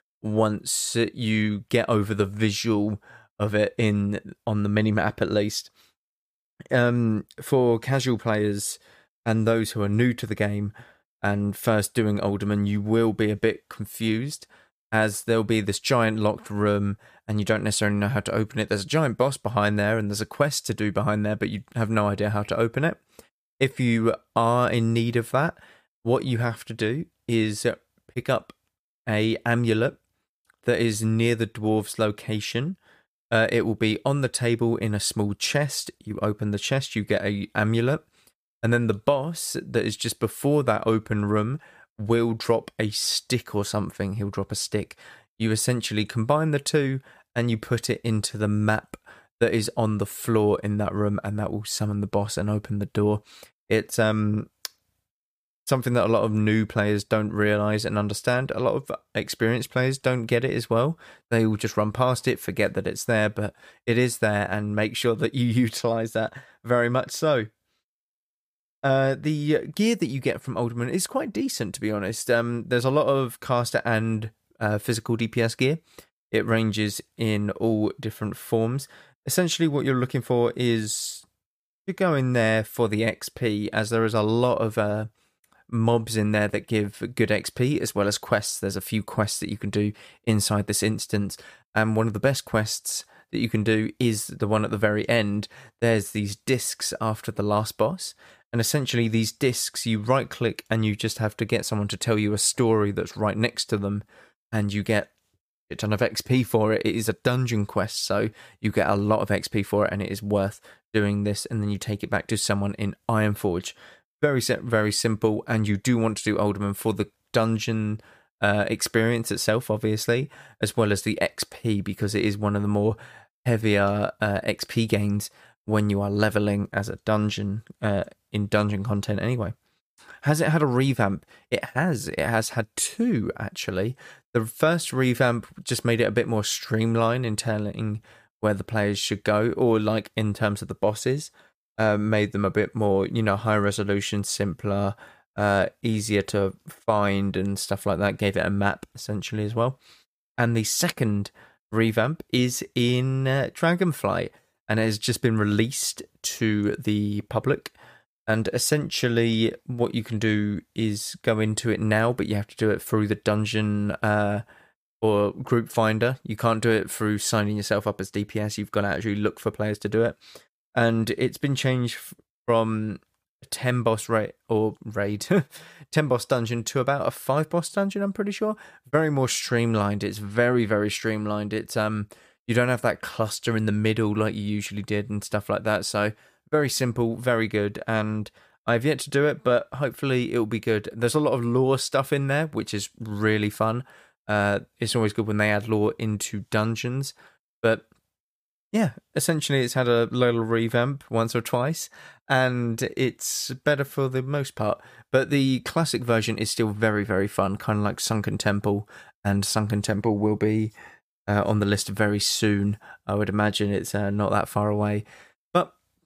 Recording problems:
none

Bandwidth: 15 kHz